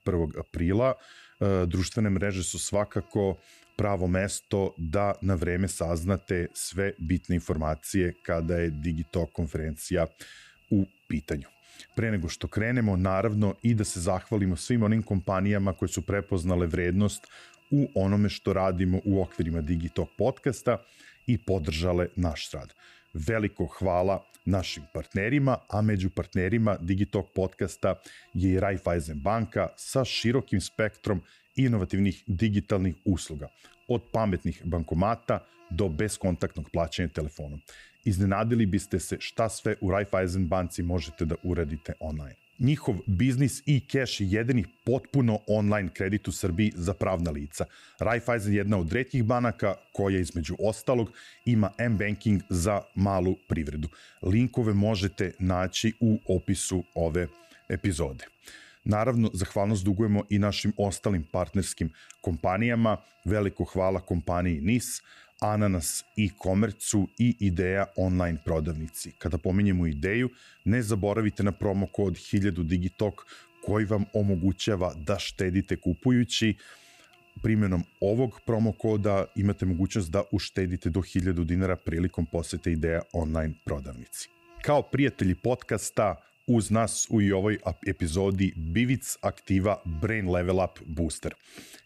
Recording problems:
electrical hum; faint; throughout; 50 Hz, 30 dB below the speech

